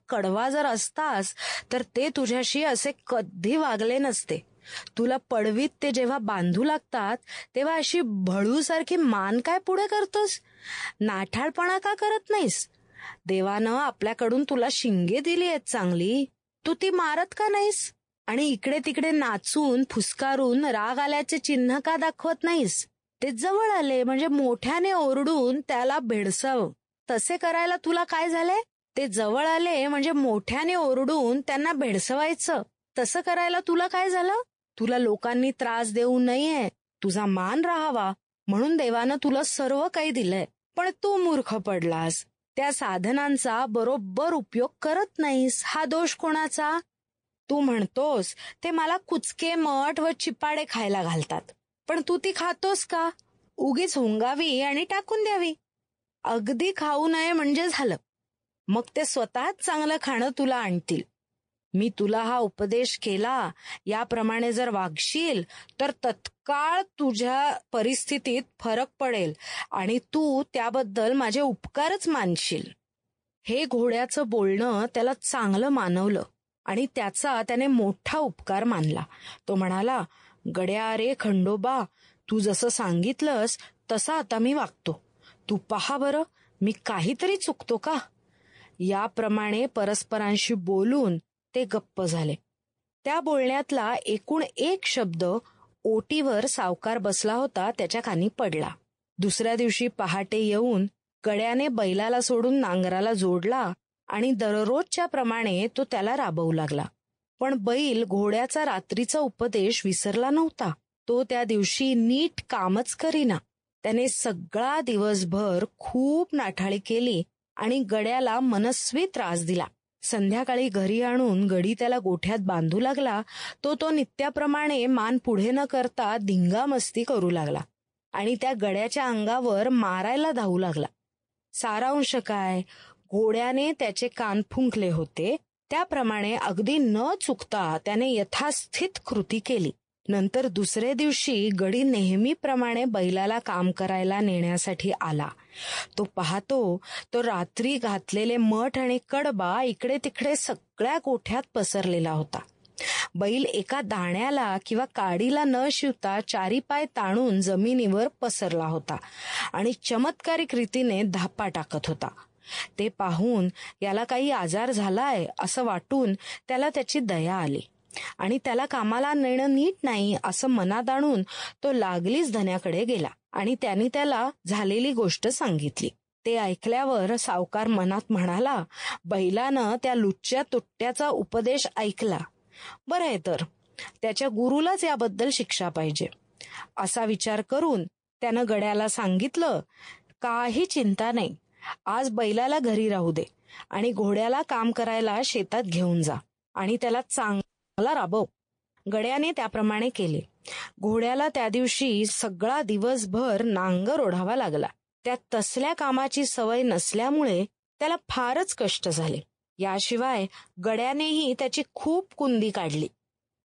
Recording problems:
garbled, watery; slightly
audio freezing; at 3:17

